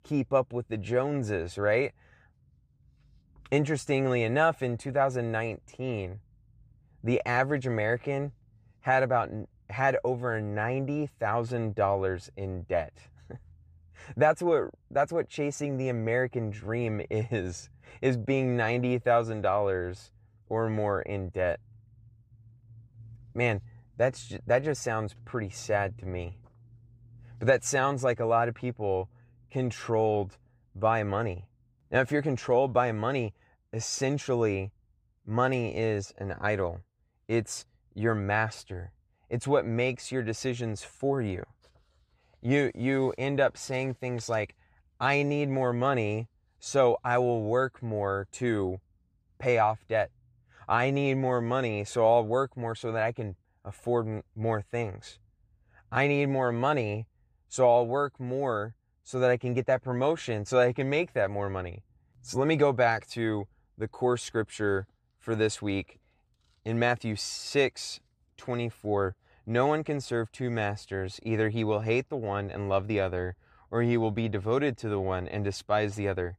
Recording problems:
none

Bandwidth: 15 kHz